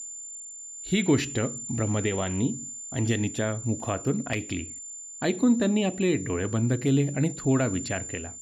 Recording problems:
high-pitched whine; loud; throughout; 7 kHz, 10 dB below the speech

